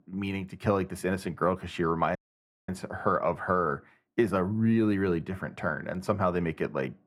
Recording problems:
muffled; slightly; fading above 2.5 kHz
audio cutting out; at 2 s for 0.5 s

